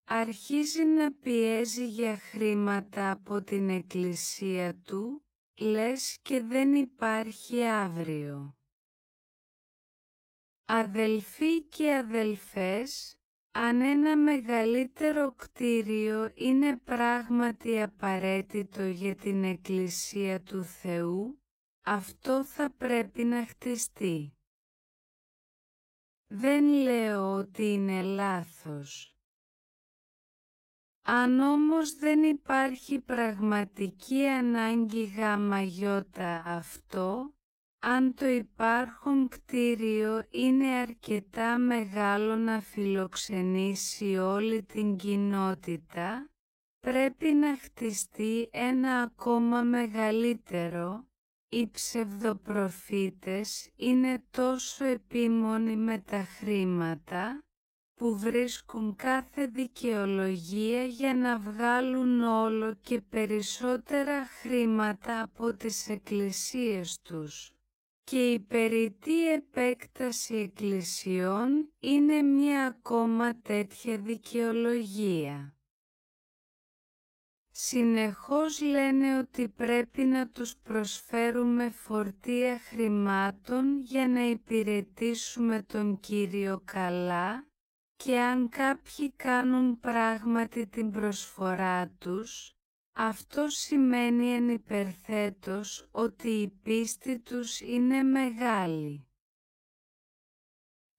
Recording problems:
wrong speed, natural pitch; too slow; 0.5 times normal speed

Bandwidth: 16 kHz